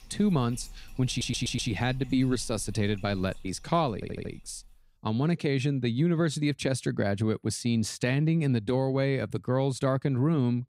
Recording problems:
household noises; faint; until 4.5 s; 25 dB below the speech
audio stuttering; at 1 s and at 4 s

